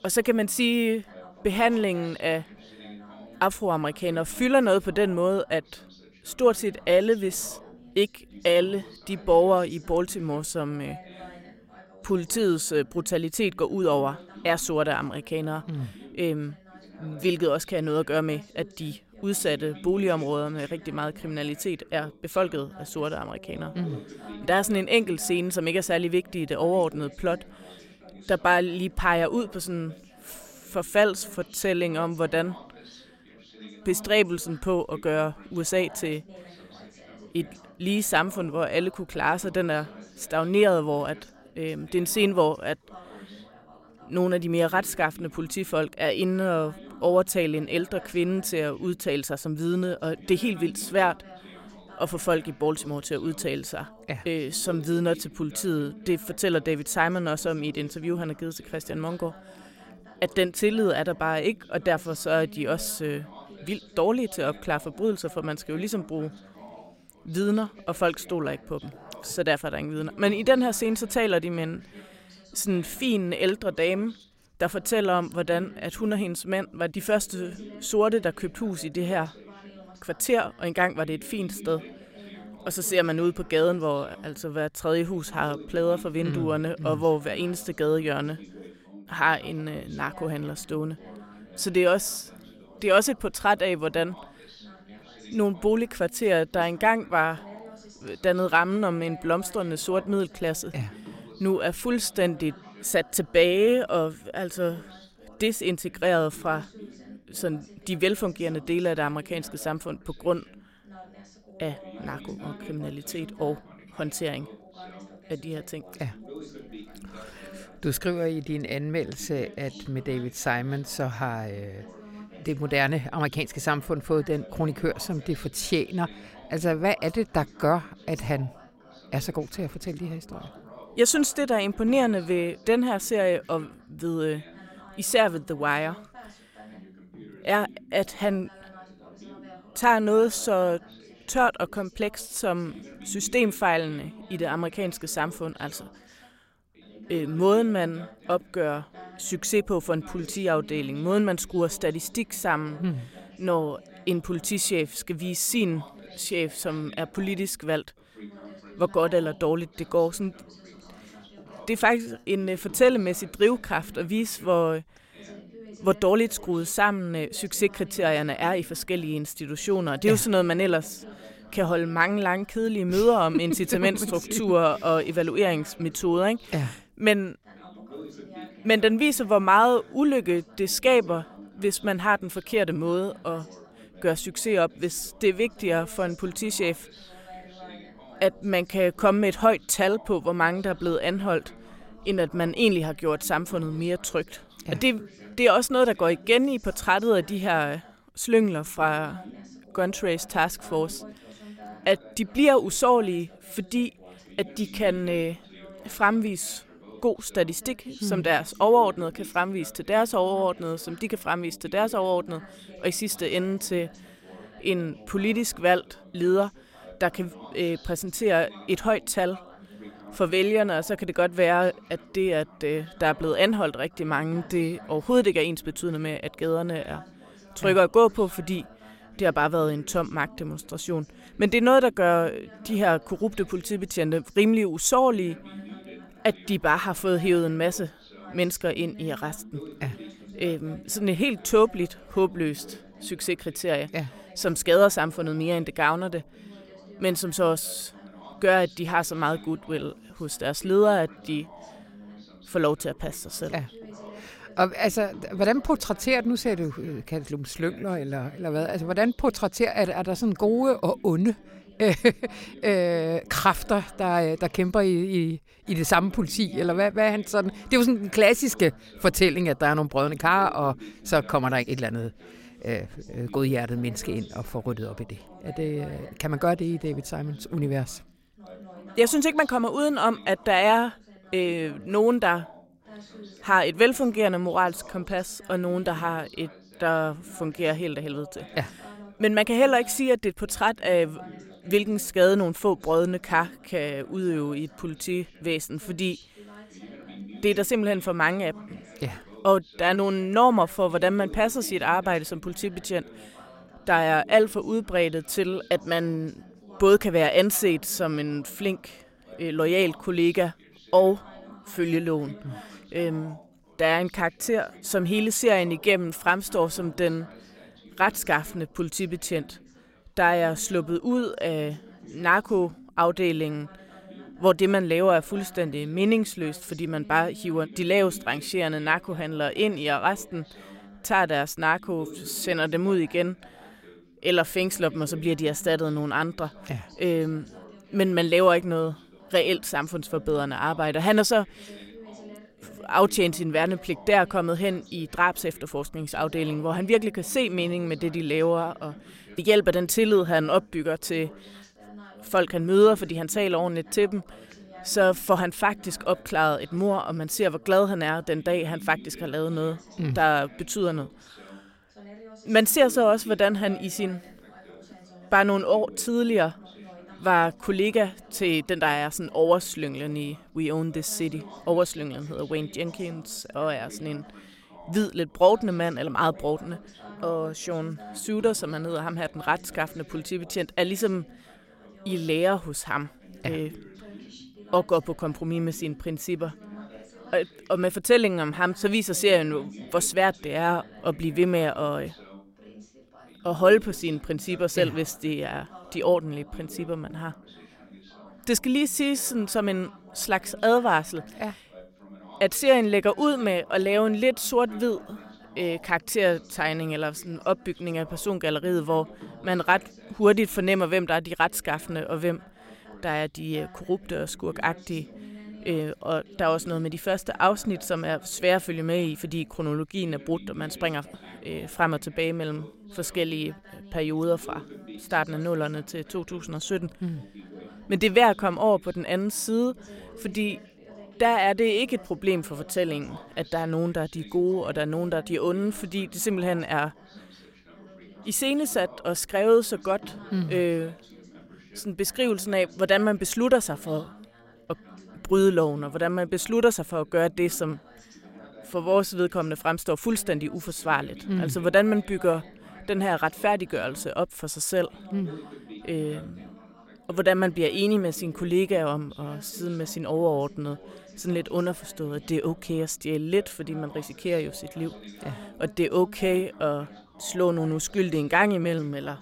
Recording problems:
background chatter; faint; throughout; 2 voices, 20 dB below the speech

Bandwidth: 16 kHz